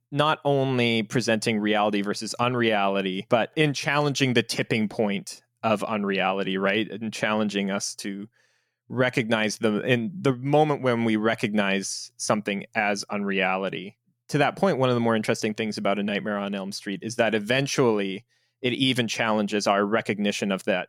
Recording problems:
none

